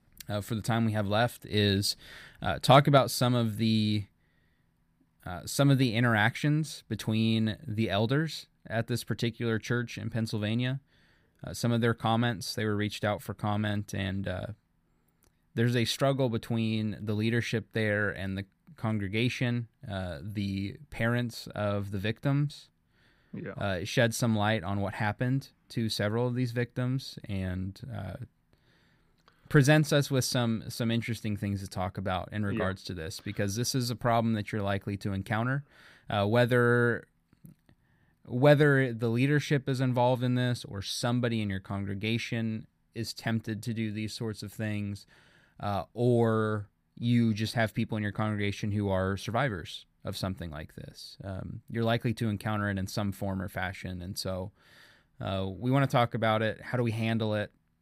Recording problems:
none

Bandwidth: 15 kHz